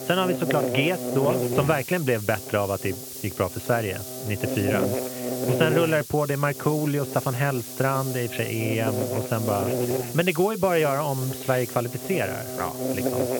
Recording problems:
high frequencies cut off; severe; nothing above 4 kHz
electrical hum; loud; throughout; 50 Hz, 6 dB below the speech
hiss; loud; throughout; 10 dB below the speech

